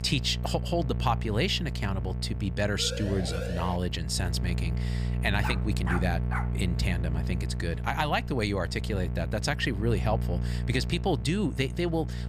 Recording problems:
electrical hum; noticeable; throughout; 60 Hz, 15 dB below the speech
siren; noticeable; at 3 s; peak 7 dB below the speech
dog barking; noticeable; from 5.5 to 6.5 s; peak 6 dB below the speech

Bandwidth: 15 kHz